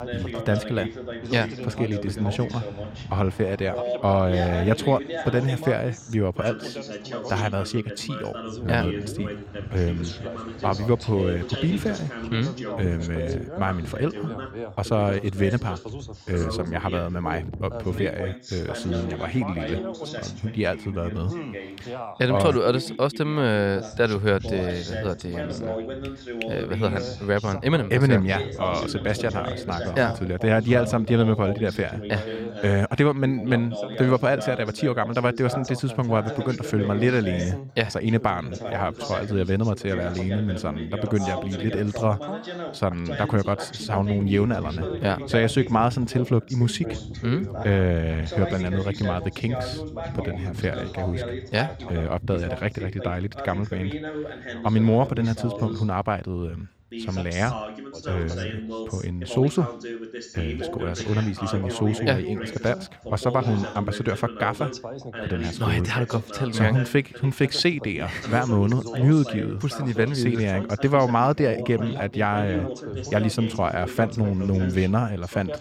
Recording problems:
background chatter; loud; throughout; 2 voices, 9 dB below the speech

